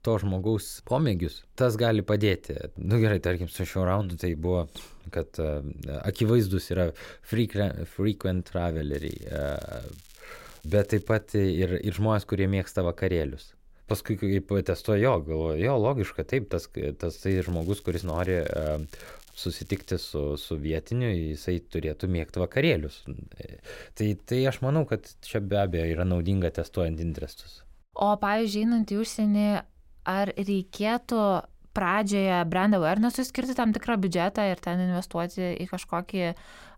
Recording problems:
crackling; faint; from 9 to 11 s and from 17 to 20 s; 25 dB below the speech

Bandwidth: 16 kHz